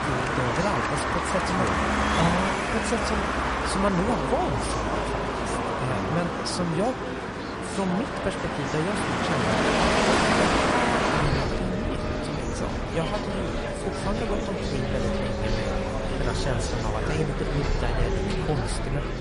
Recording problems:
garbled, watery; slightly; nothing above 10.5 kHz
traffic noise; very loud; throughout; 4 dB above the speech
murmuring crowd; loud; throughout; 2 dB below the speech
animal sounds; faint; from 14 s on; 20 dB below the speech
hiss; faint; throughout; 30 dB below the speech

